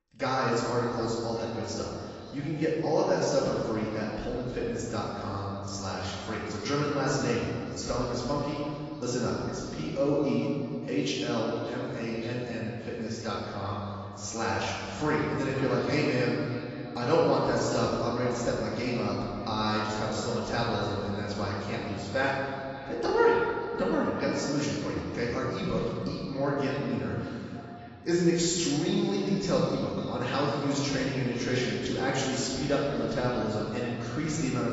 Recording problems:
room echo; strong; dies away in 2 s
off-mic speech; far
garbled, watery; badly; nothing above 7.5 kHz
echo of what is said; noticeable; throughout; 570 ms later, 20 dB below the speech

